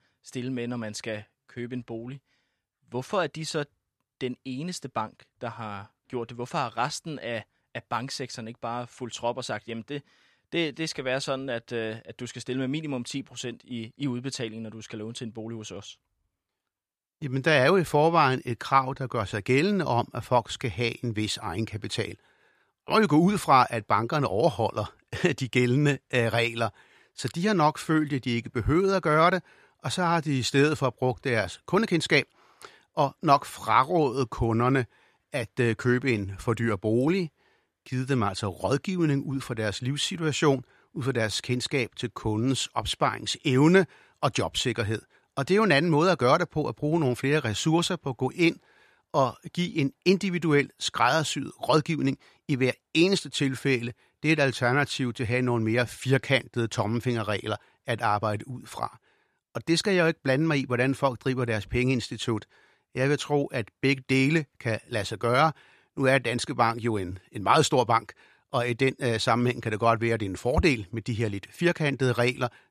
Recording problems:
none

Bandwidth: 14.5 kHz